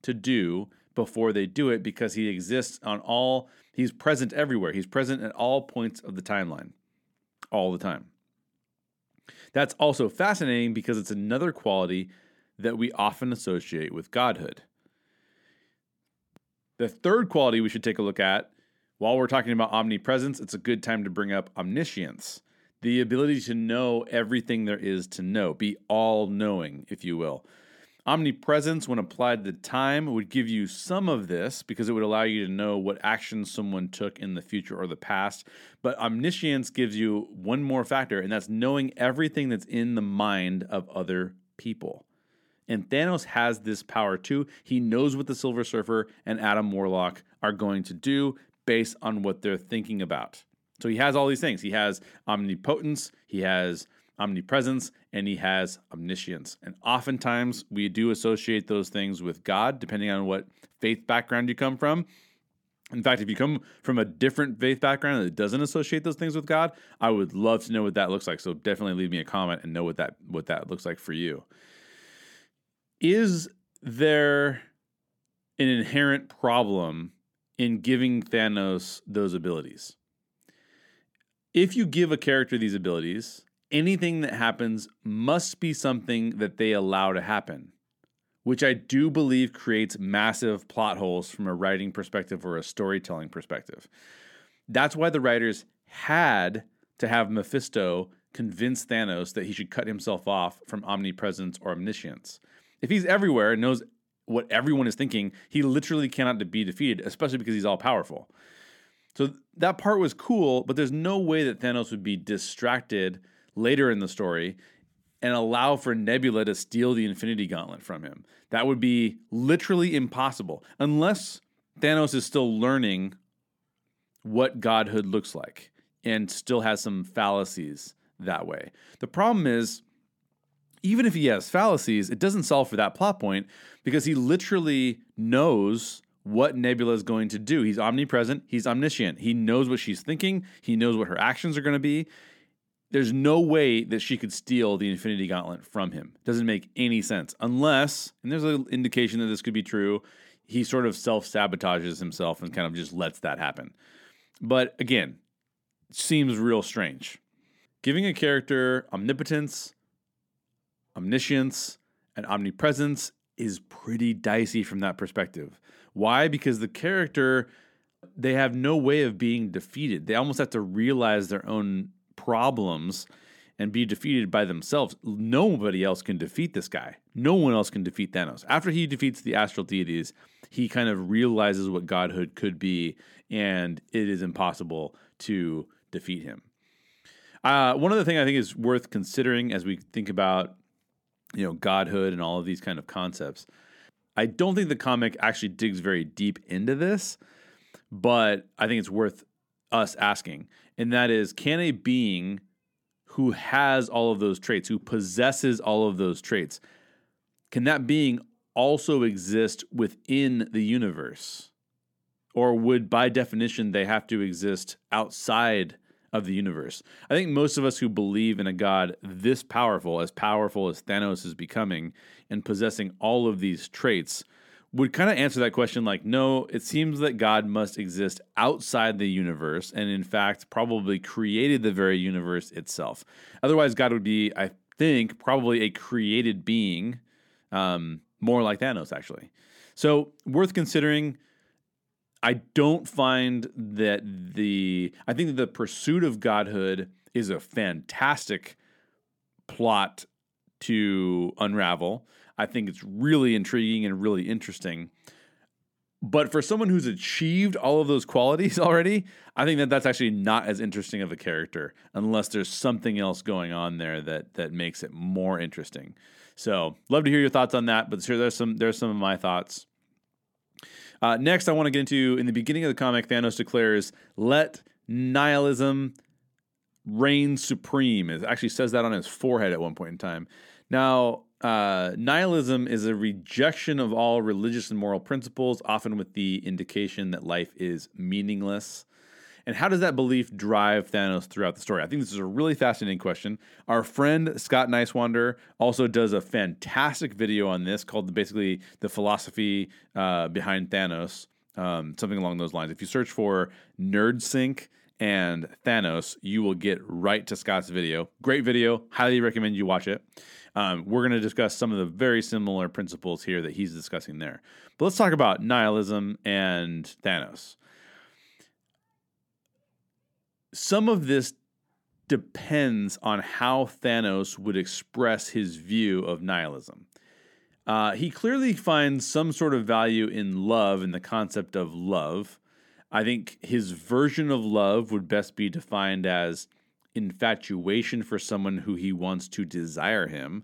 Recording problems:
uneven, jittery; strongly; from 1 s to 5:10

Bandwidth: 17.5 kHz